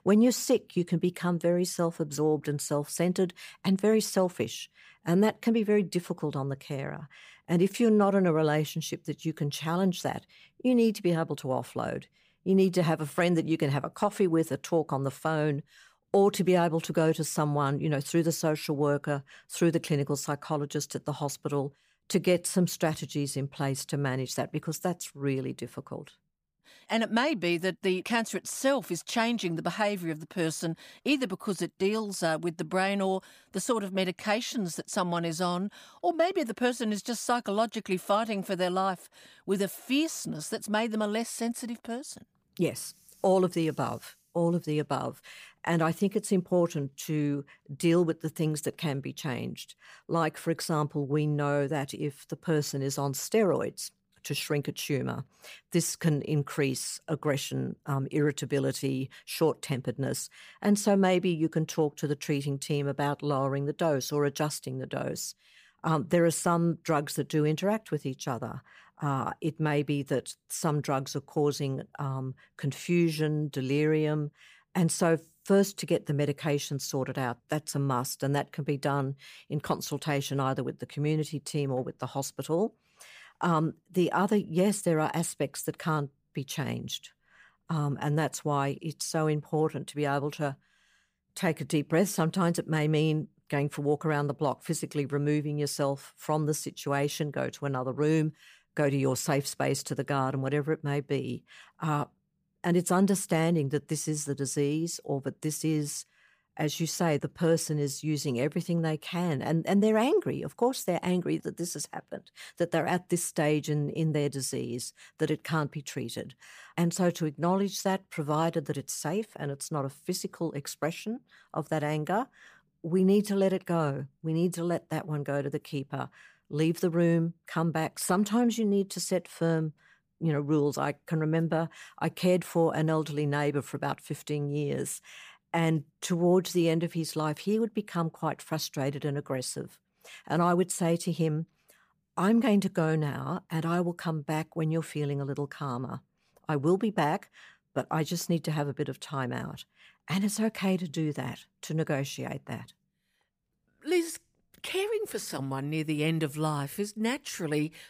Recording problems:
none

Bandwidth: 15 kHz